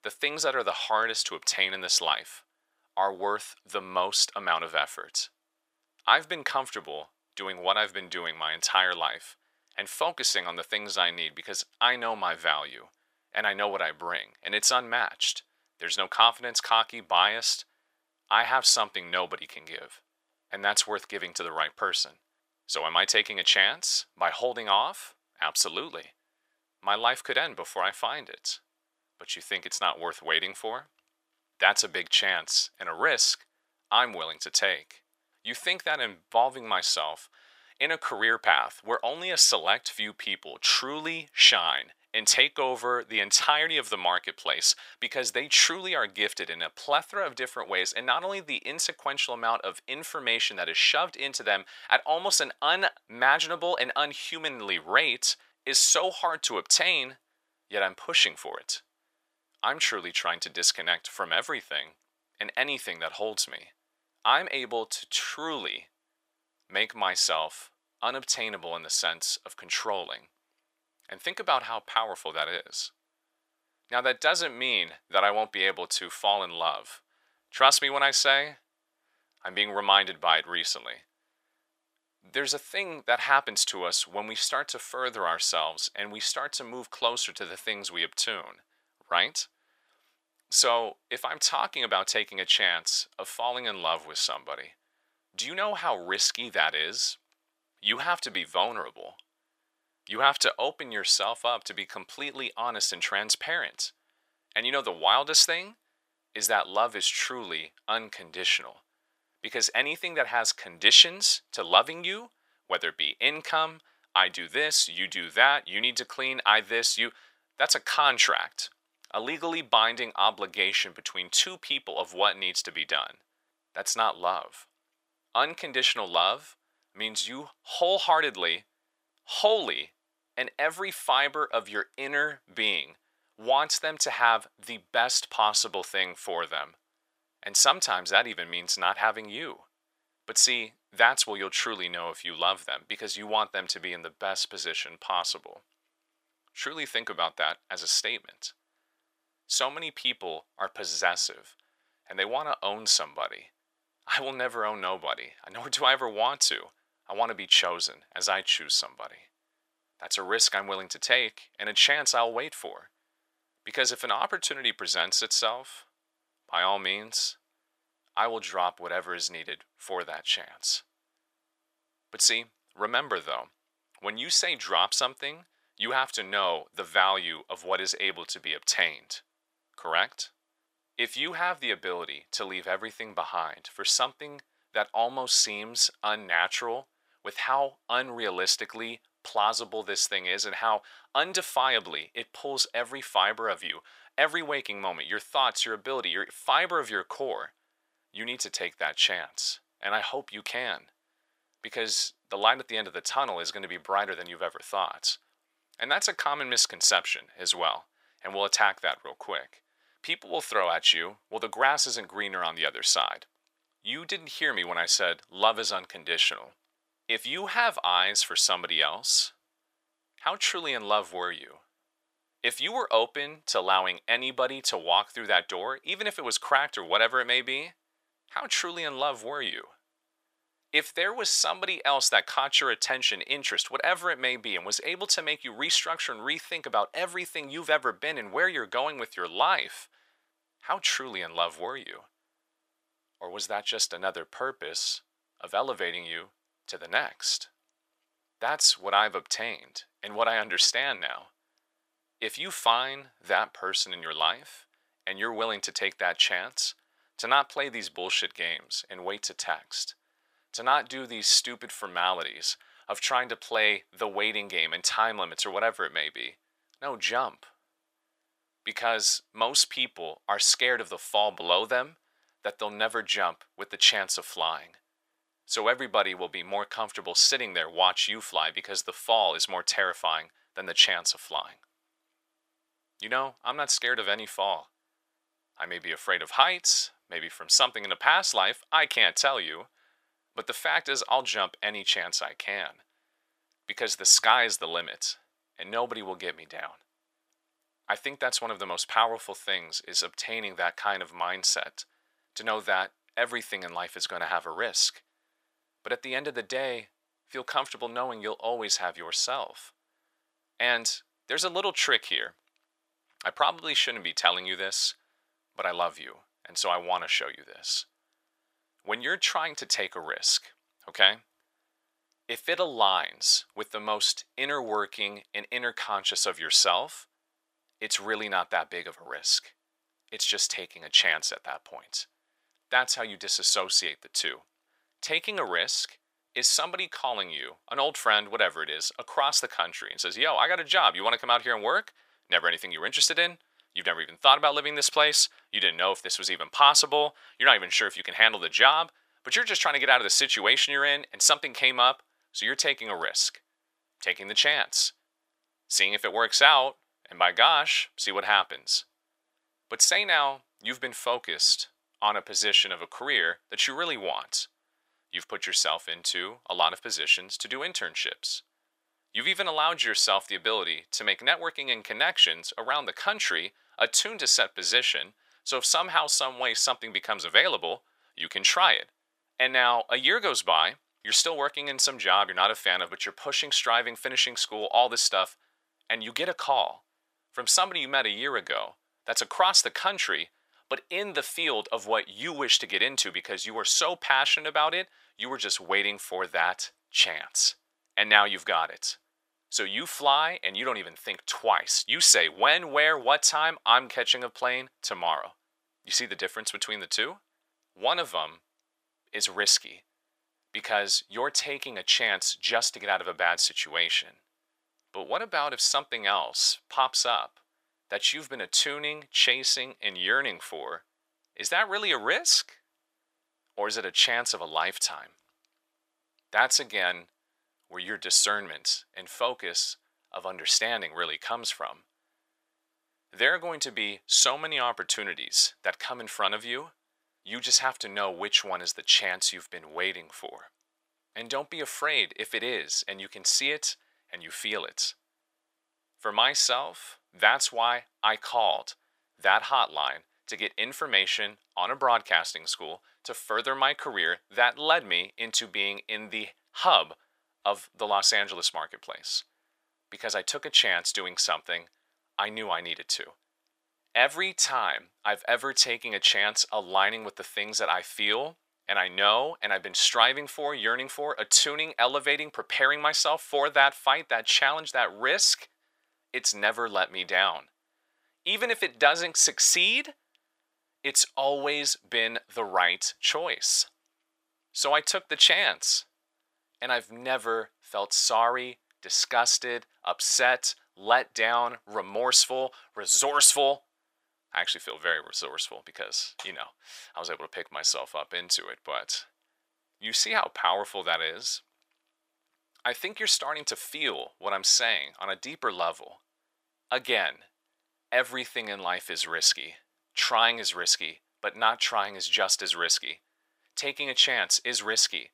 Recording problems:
thin; very; fading below 900 Hz

